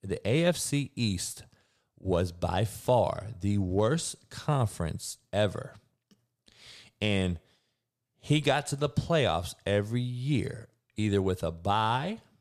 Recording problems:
none

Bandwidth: 14.5 kHz